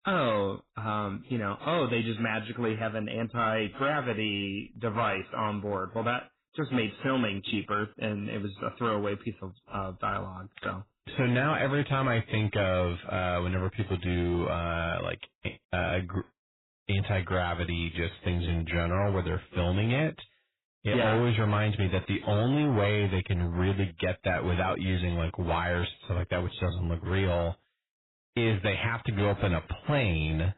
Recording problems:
garbled, watery; badly; nothing above 4 kHz
distortion; slight; 10% of the sound clipped

